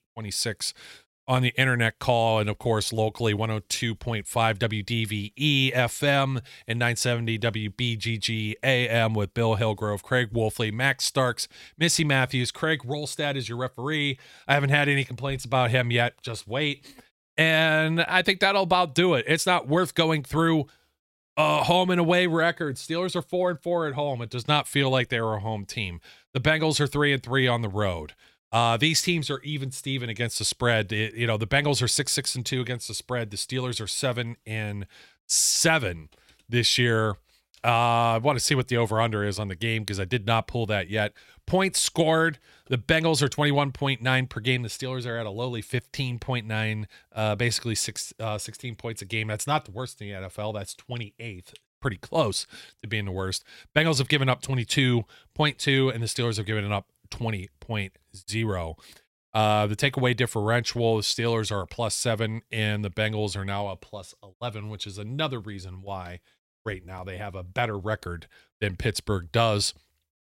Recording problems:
none

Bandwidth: 16 kHz